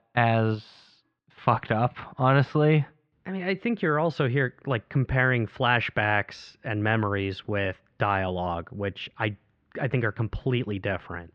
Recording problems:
muffled; very; fading above 3 kHz

